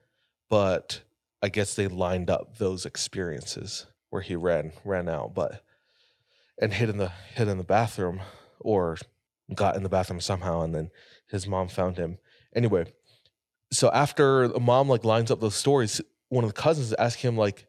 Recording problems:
none

